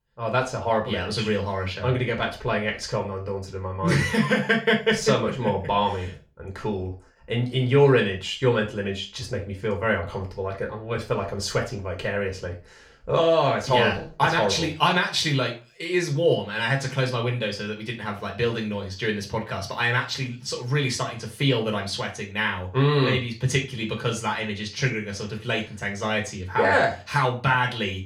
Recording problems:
off-mic speech; far
room echo; slight; dies away in 0.3 s

